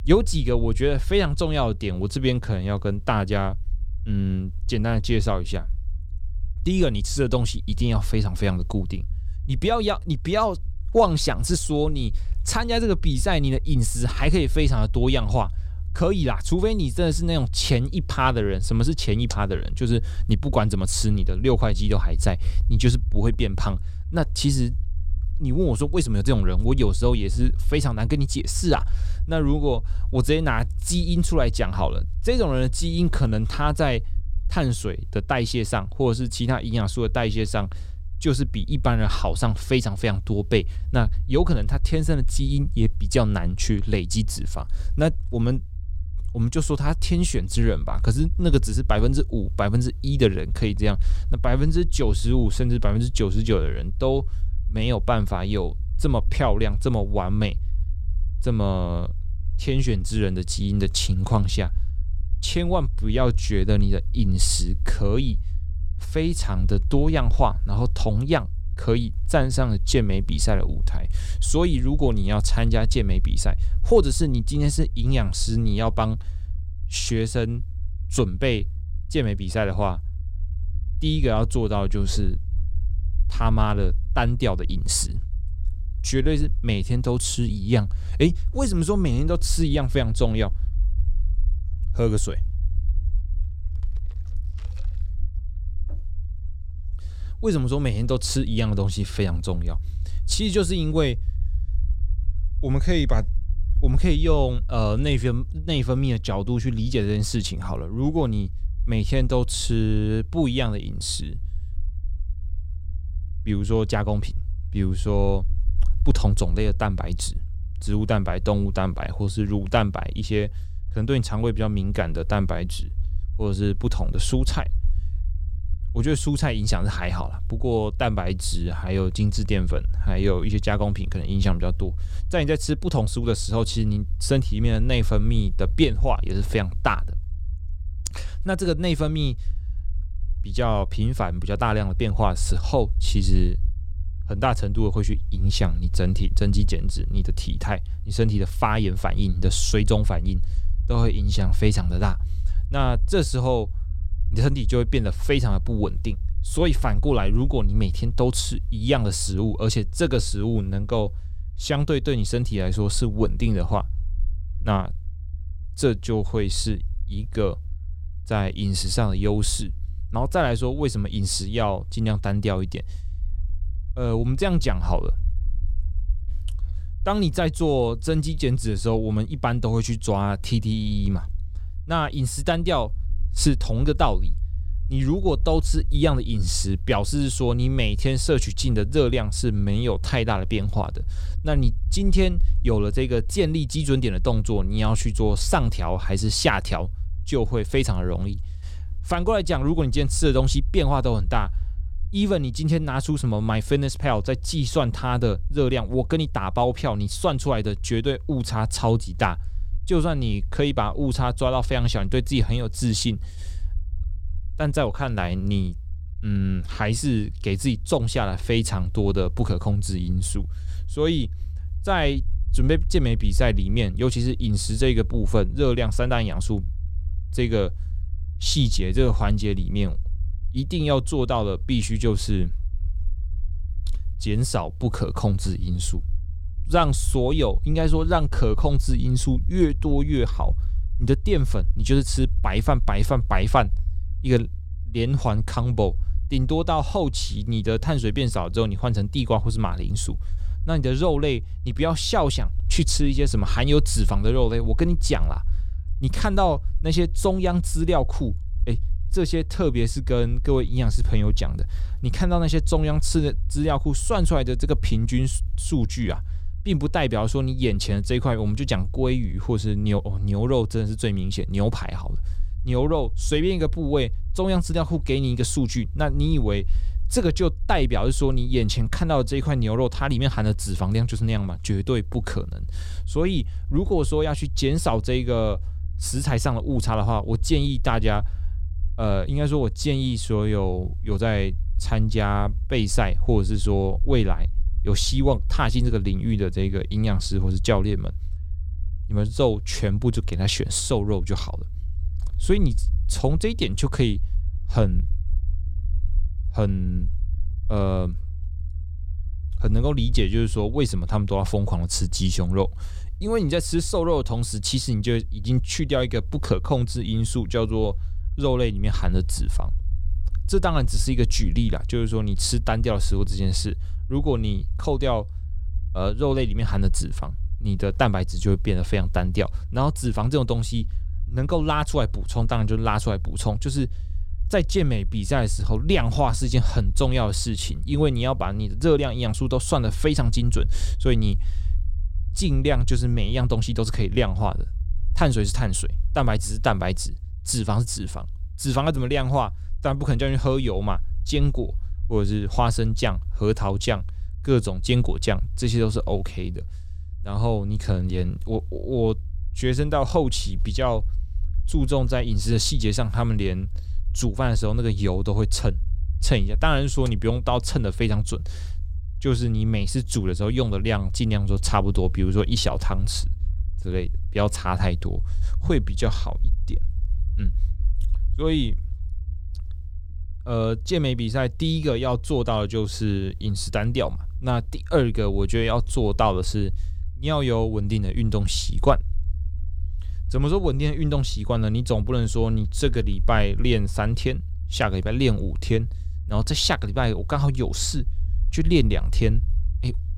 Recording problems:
low rumble; faint; throughout; 25 dB below the speech

